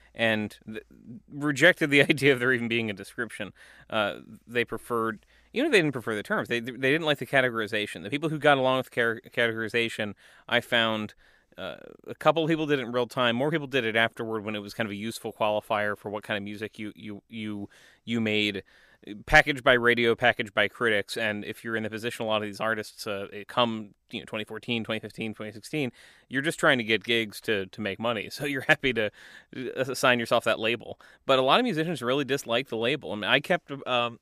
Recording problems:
none

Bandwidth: 15 kHz